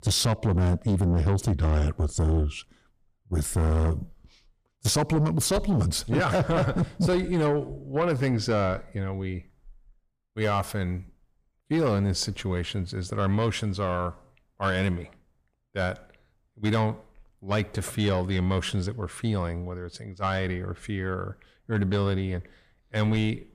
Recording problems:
distortion; slight; 10 dB below the speech

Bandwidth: 15 kHz